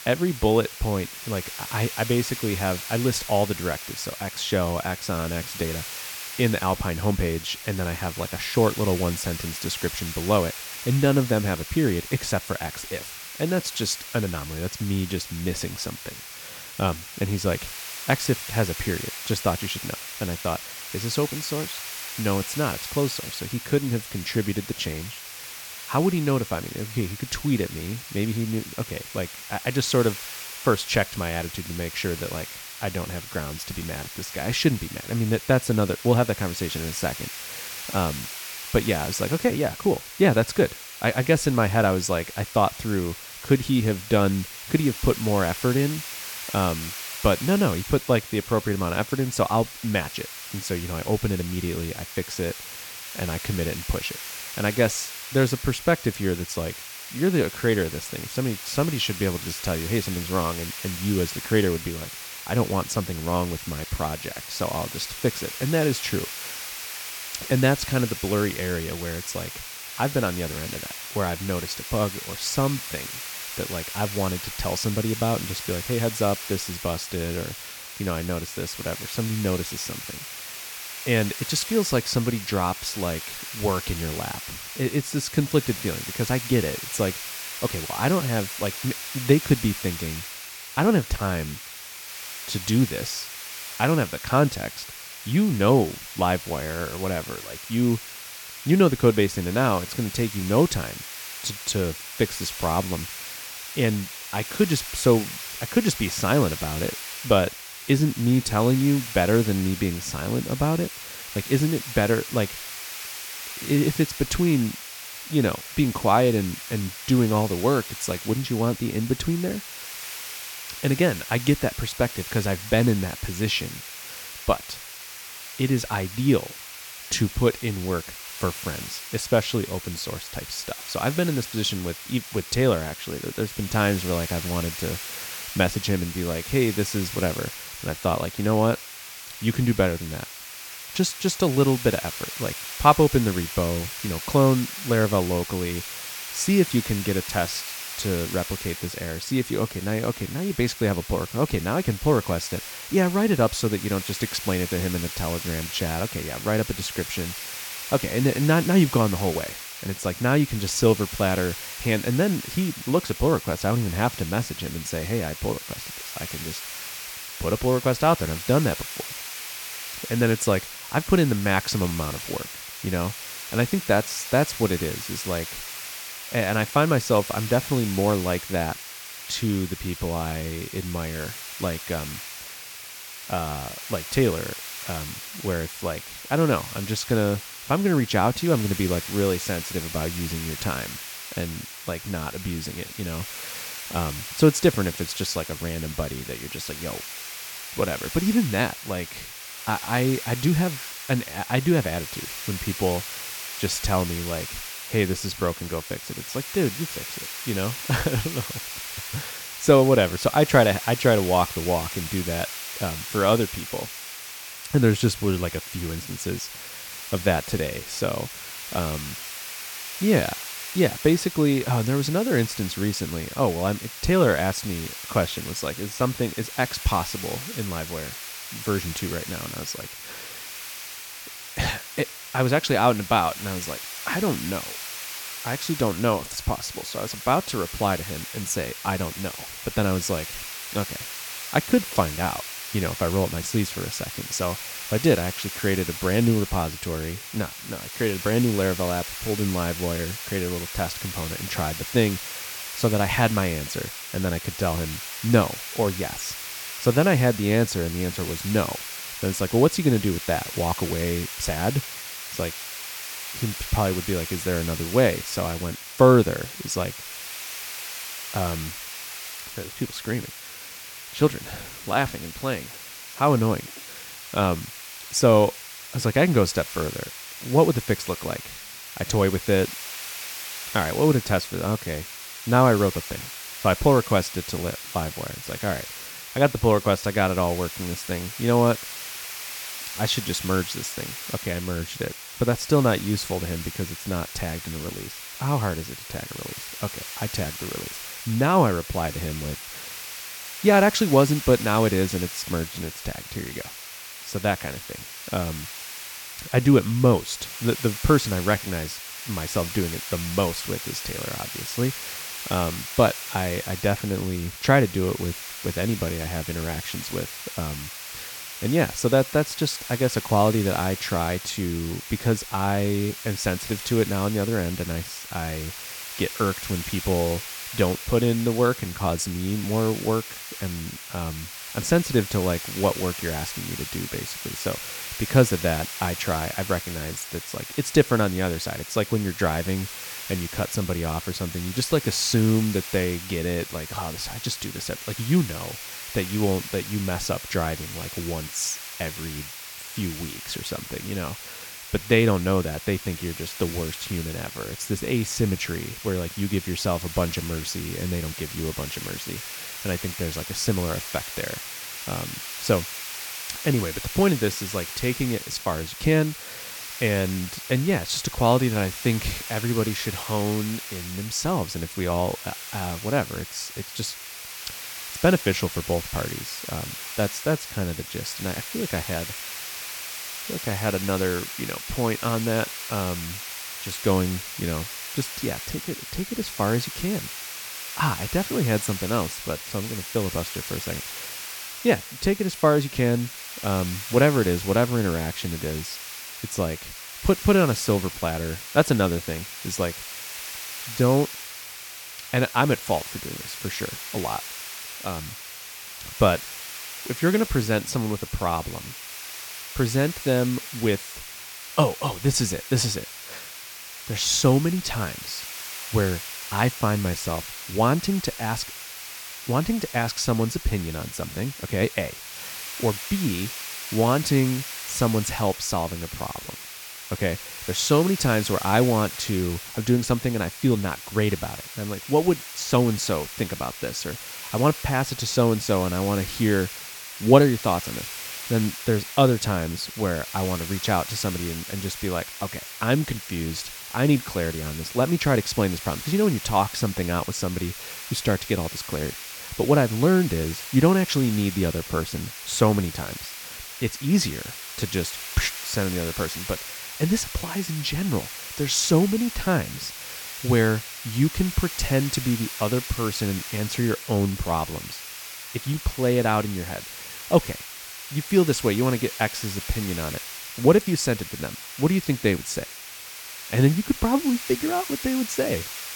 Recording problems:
hiss; loud; throughout; 9 dB below the speech

